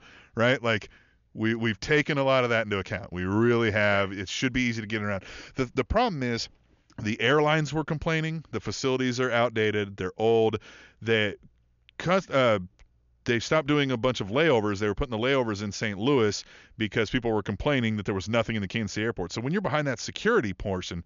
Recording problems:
high frequencies cut off; noticeable; nothing above 7 kHz

